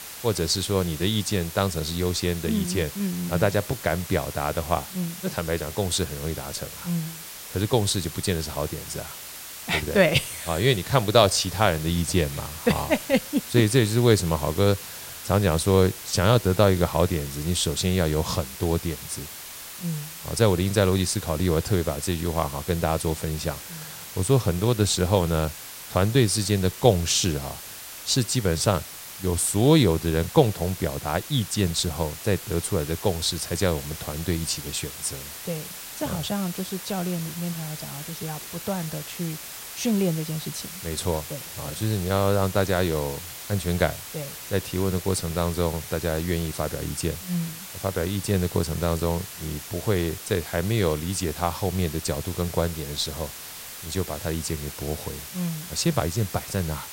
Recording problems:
hiss; noticeable; throughout; 10 dB below the speech

